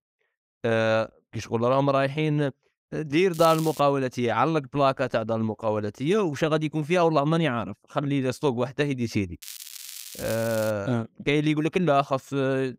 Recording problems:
crackling; noticeable; at 3.5 s and from 9.5 to 11 s; 15 dB below the speech

